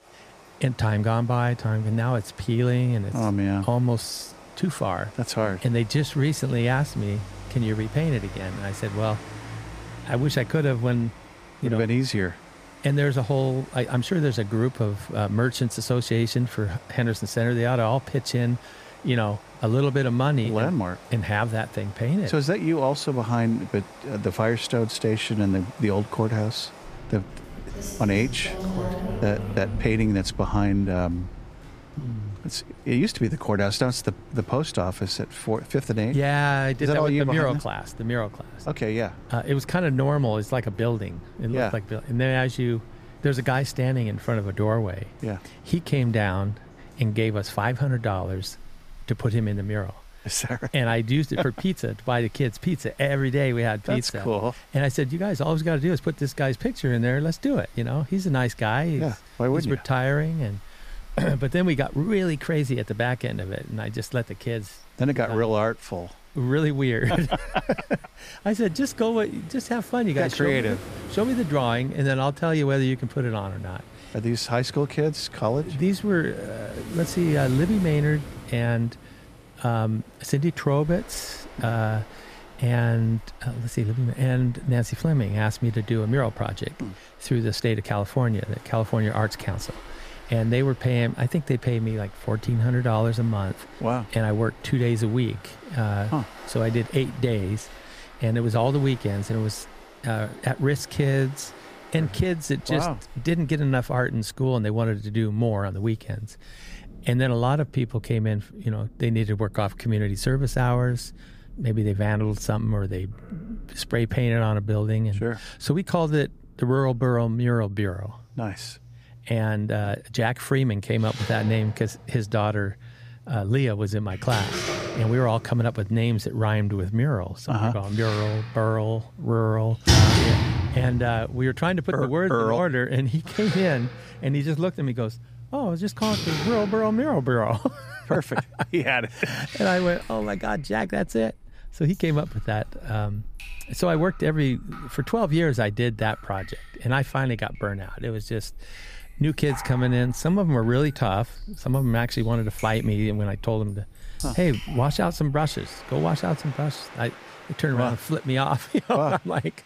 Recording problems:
rain or running water; noticeable; throughout; 10 dB below the speech

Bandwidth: 15 kHz